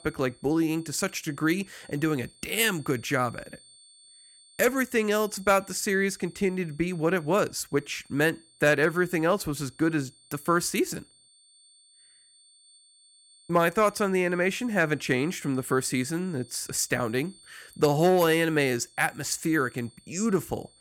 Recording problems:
high-pitched whine; faint; throughout; 4.5 kHz, 25 dB below the speech

